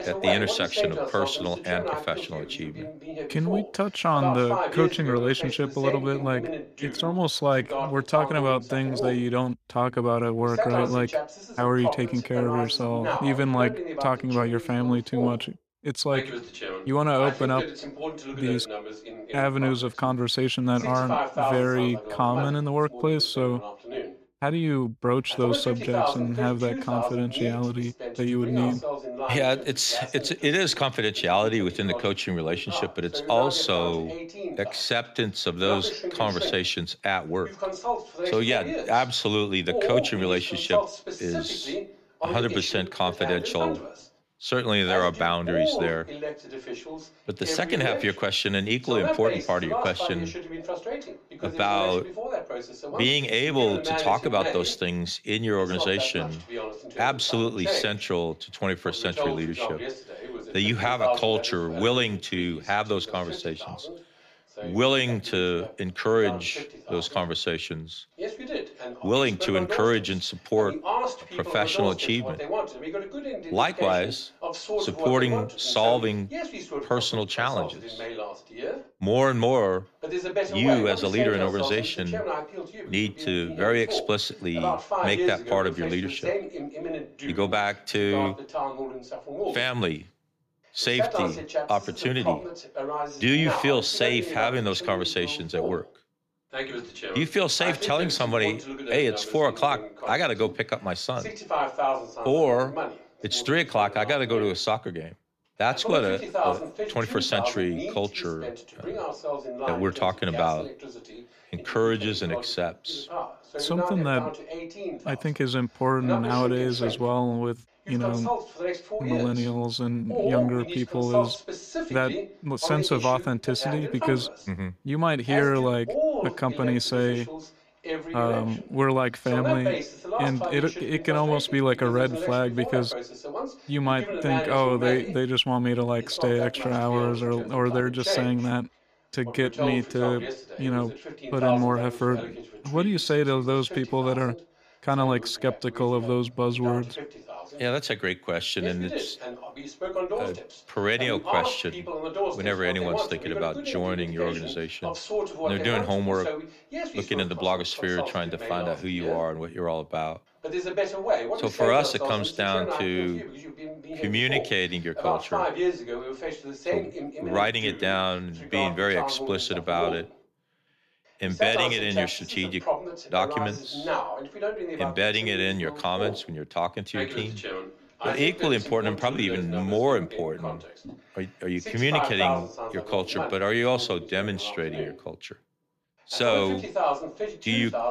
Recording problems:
voice in the background; loud; throughout; 6 dB below the speech

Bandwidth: 15 kHz